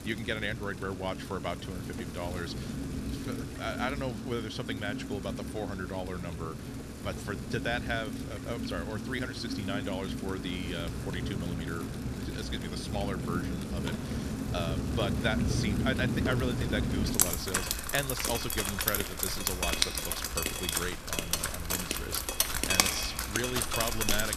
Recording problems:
rain or running water; very loud; throughout; 3 dB above the speech

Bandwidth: 14 kHz